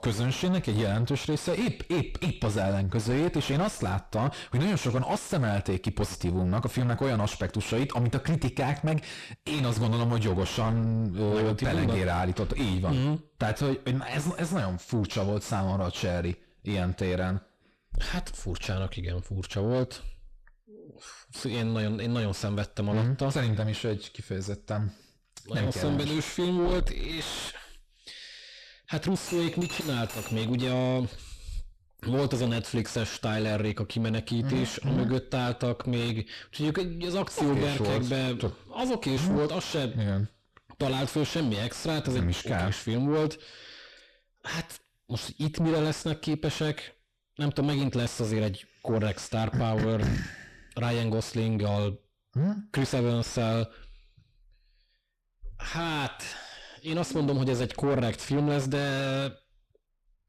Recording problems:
distortion; heavy; 5 dB below the speech
clattering dishes; noticeable; from 29 to 31 s; peak 5 dB below the speech

